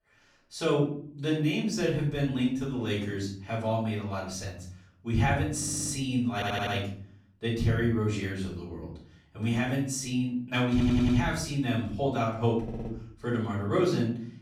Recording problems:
off-mic speech; far
room echo; noticeable; dies away in 0.6 s
audio stuttering; 4 times, first at 5.5 s

